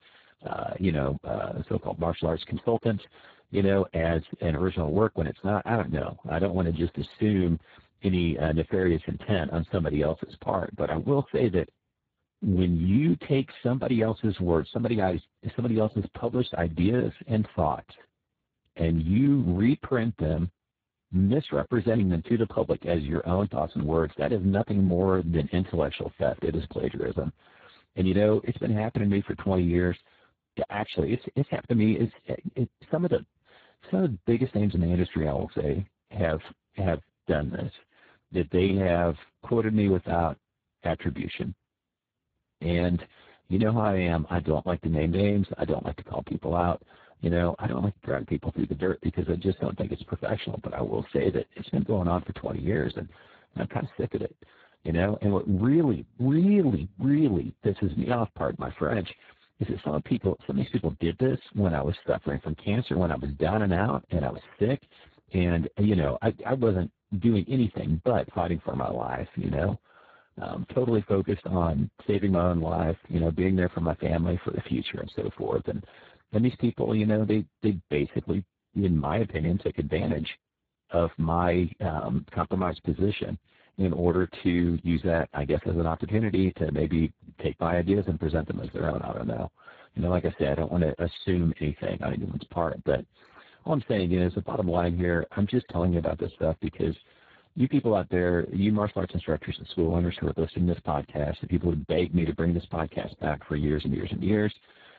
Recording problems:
garbled, watery; badly; nothing above 4 kHz

